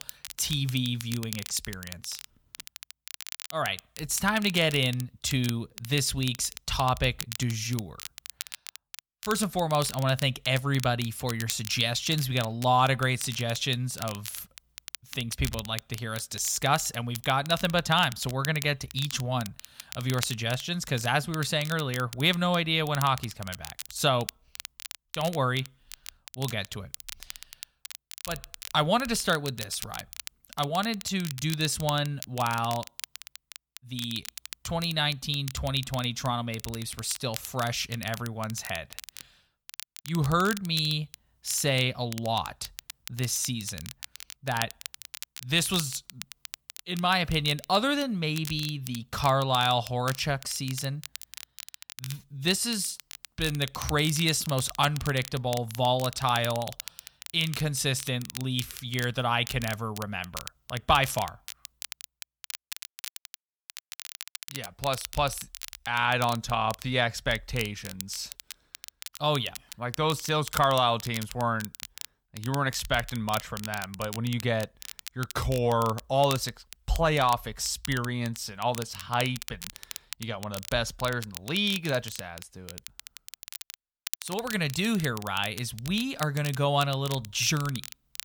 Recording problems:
crackle, like an old record; noticeable; 15 dB below the speech

